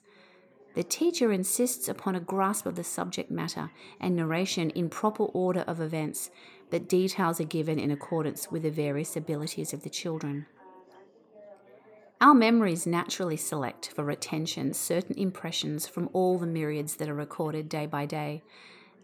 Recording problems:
background chatter; faint; throughout; 4 voices, 25 dB below the speech

